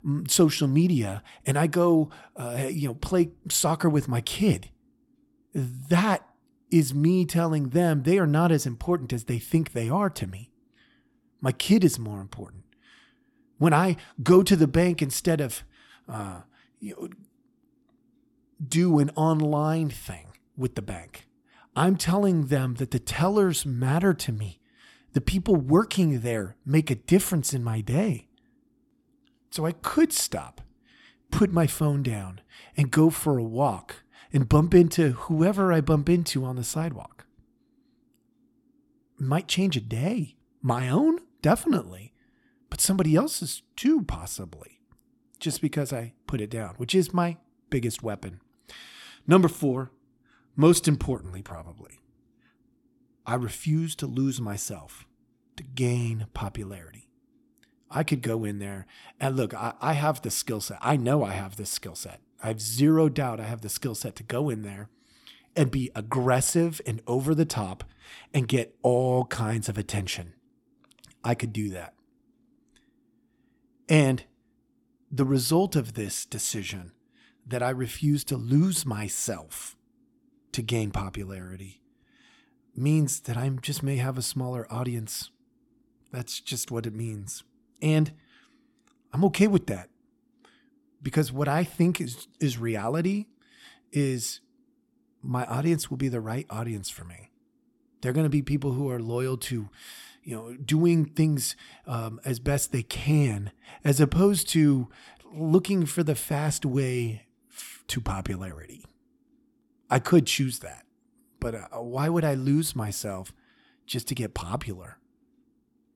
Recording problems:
none

